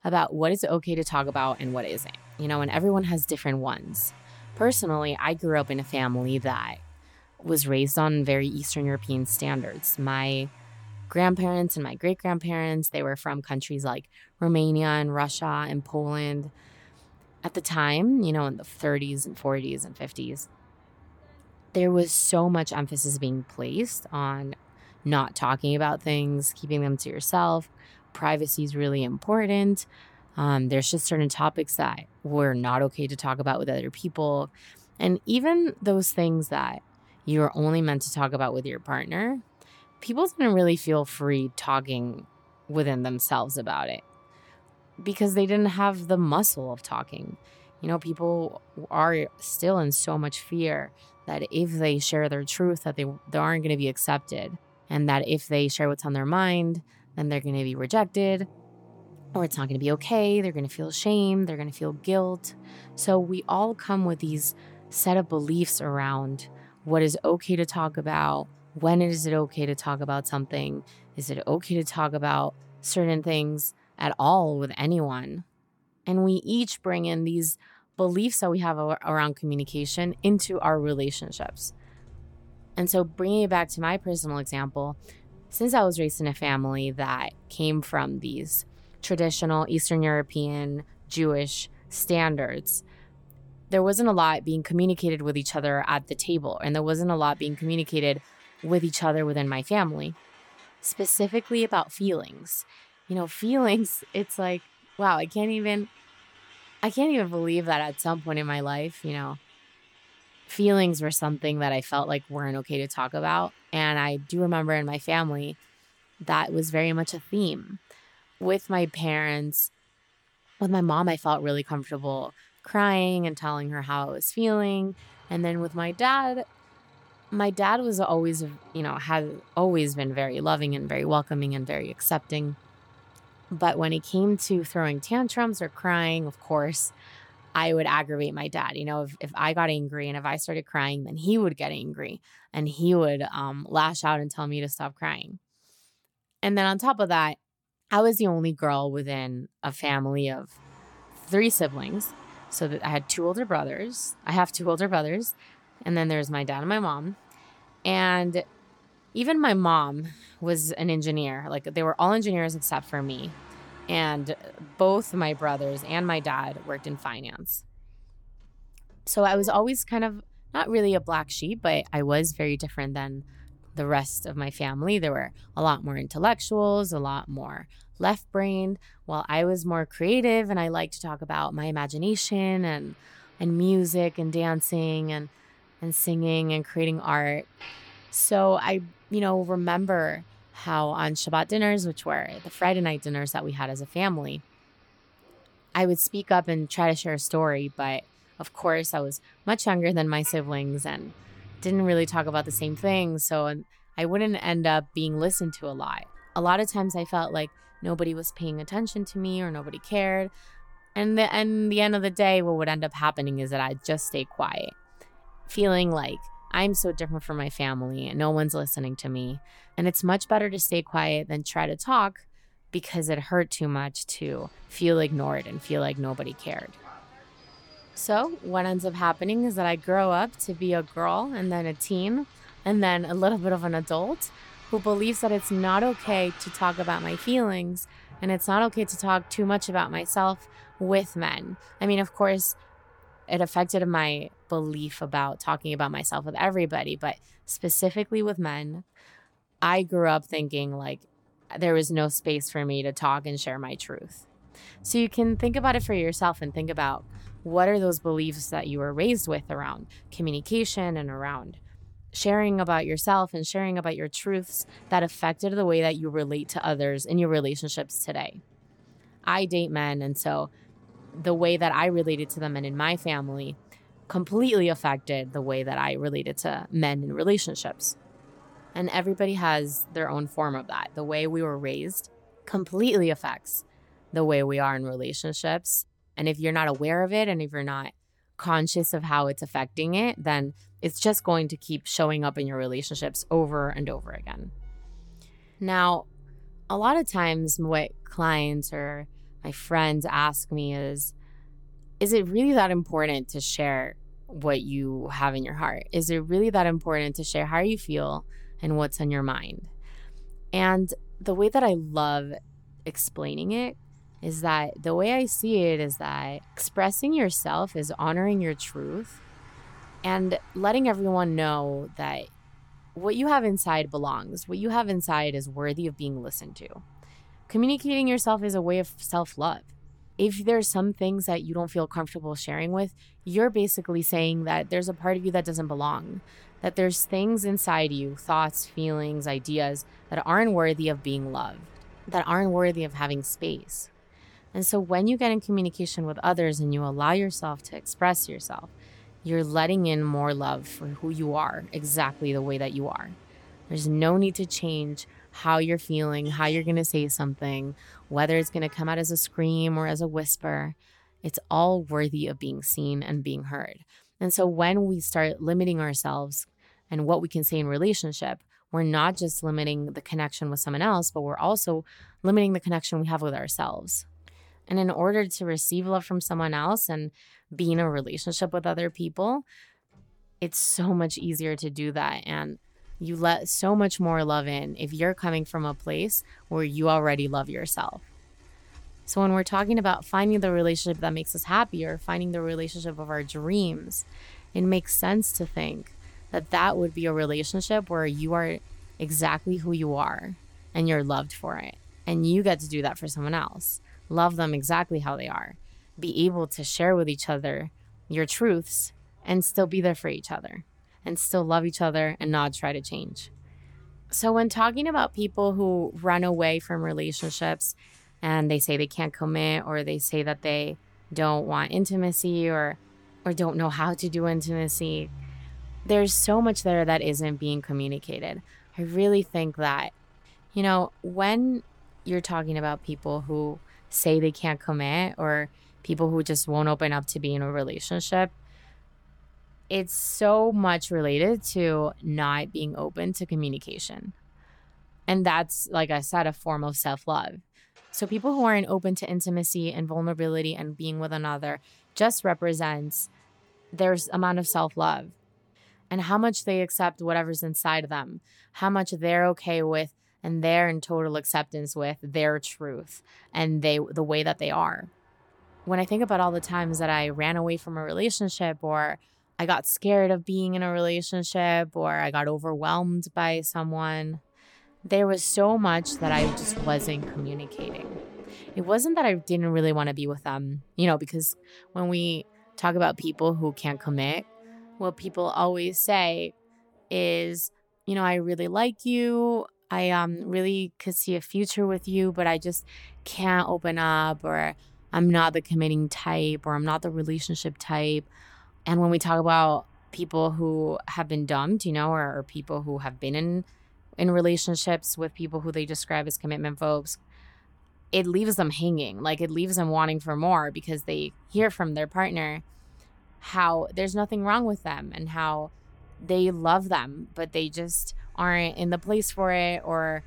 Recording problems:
traffic noise; faint; throughout; 25 dB below the speech

